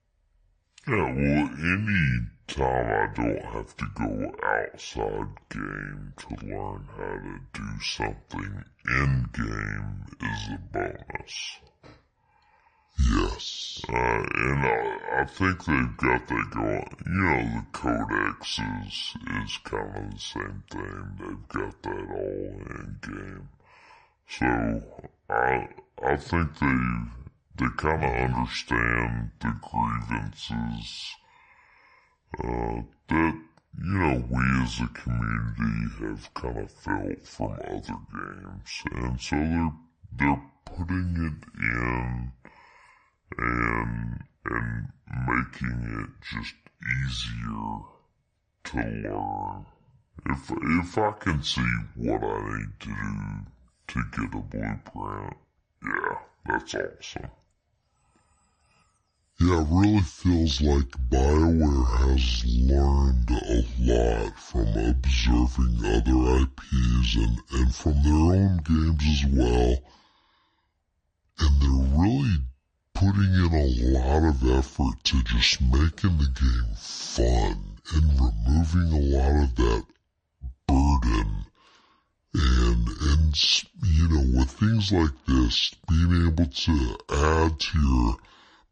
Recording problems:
wrong speed and pitch; too slow and too low; 0.6 times normal speed

